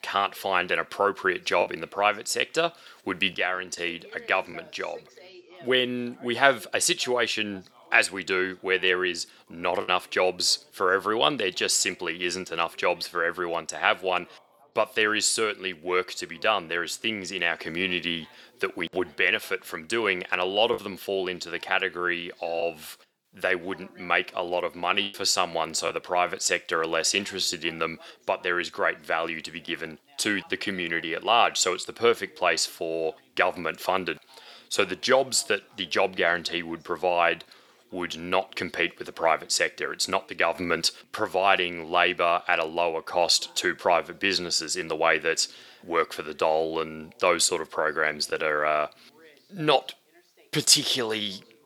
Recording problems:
thin; somewhat; fading below 350 Hz
background chatter; faint; throughout; 2 voices, 30 dB below the speech
choppy; occasionally; 1% of the speech affected

